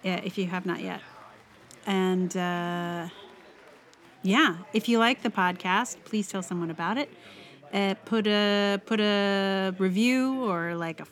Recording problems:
chatter from many people; faint; throughout; 25 dB below the speech

